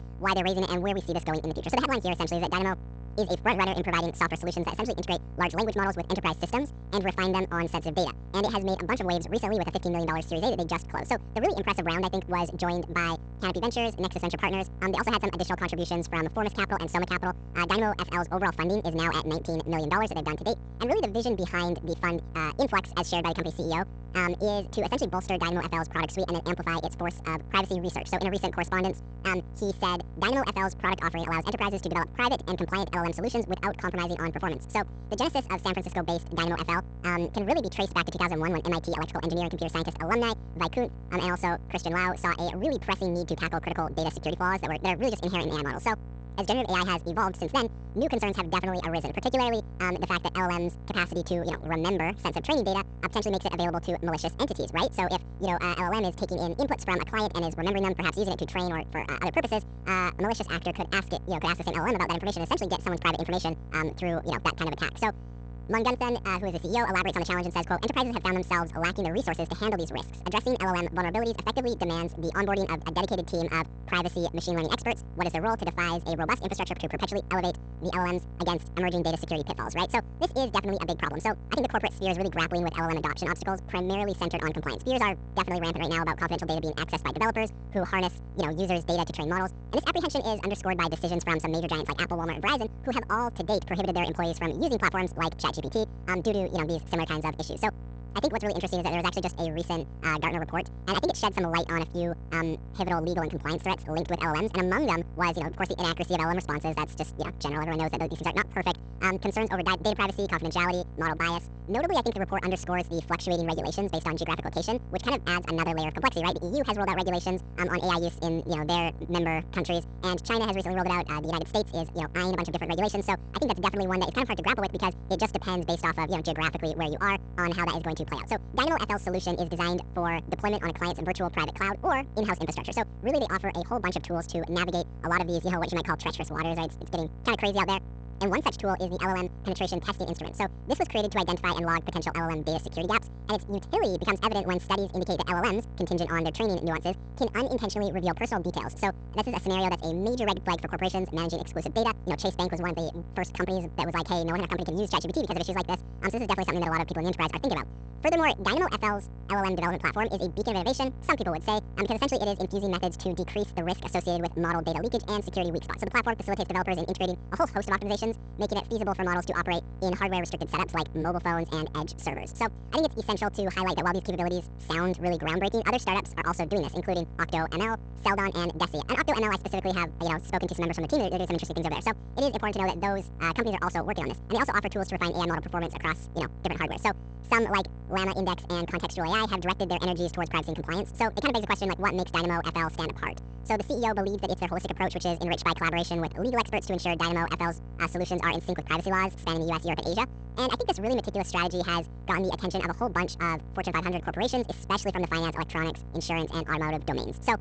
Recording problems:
wrong speed and pitch; too fast and too high; 1.7 times normal speed
garbled, watery; slightly; nothing above 8 kHz
electrical hum; faint; throughout; 60 Hz, 25 dB below the speech

